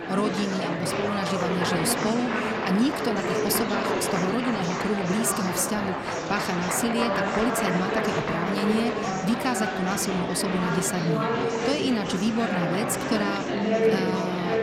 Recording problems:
murmuring crowd; very loud; throughout; 1 dB above the speech

